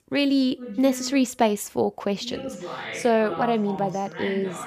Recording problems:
voice in the background; noticeable; throughout; 10 dB below the speech

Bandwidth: 15 kHz